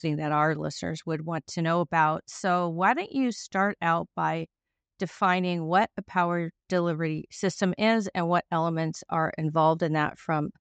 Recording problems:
high frequencies cut off; noticeable; nothing above 8 kHz

